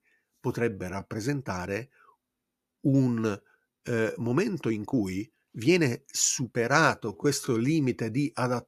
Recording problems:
uneven, jittery; strongly; from 0.5 to 7.5 s

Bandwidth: 14.5 kHz